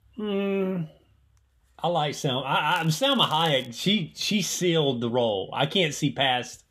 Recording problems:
crackling; faint; at 2.5 s; 25 dB below the speech

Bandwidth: 15 kHz